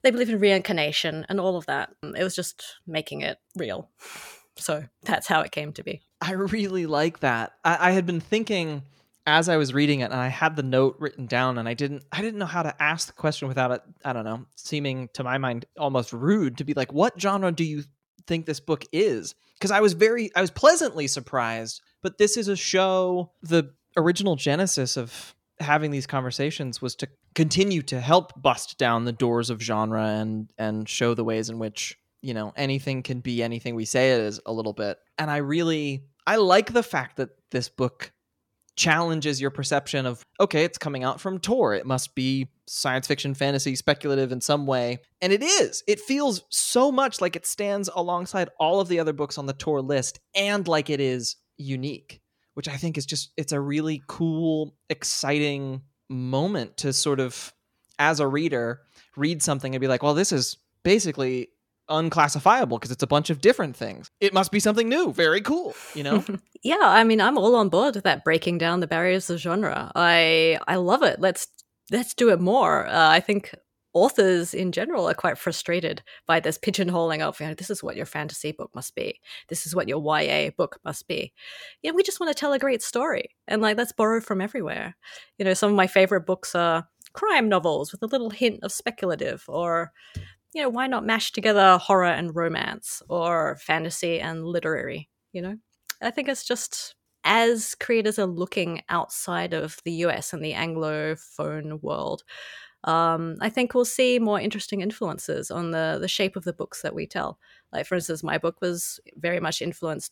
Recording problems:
none

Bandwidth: 17.5 kHz